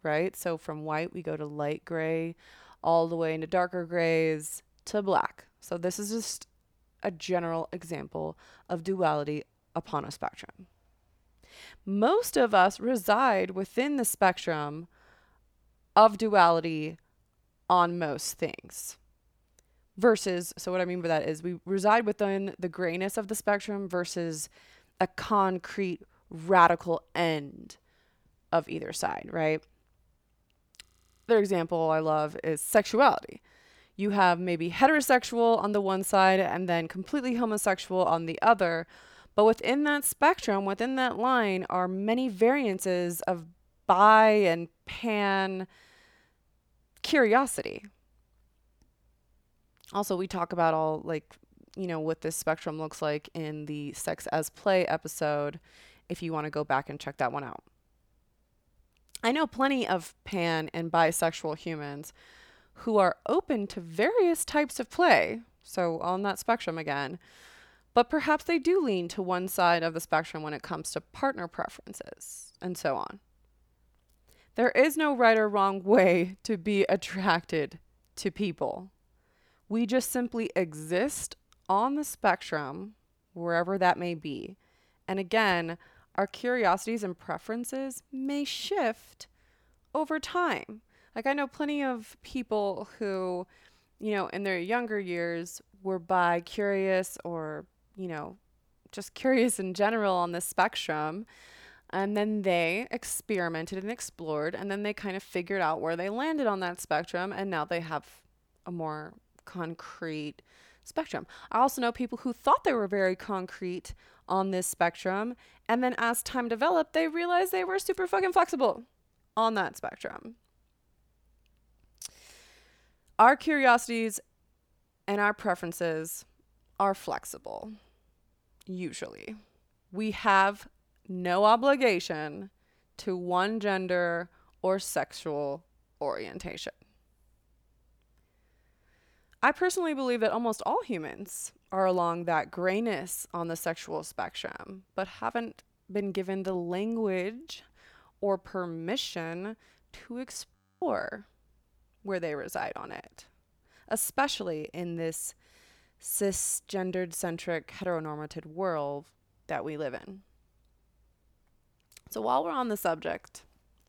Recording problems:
audio freezing; at 31 s and at 2:31

